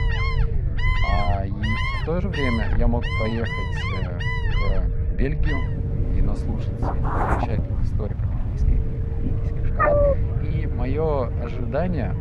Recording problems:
muffled; very; fading above 3.5 kHz
animal sounds; very loud; throughout; 1 dB above the speech
low rumble; loud; throughout; 9 dB below the speech
chatter from many people; noticeable; throughout; 15 dB below the speech
uneven, jittery; strongly; from 1 to 12 s

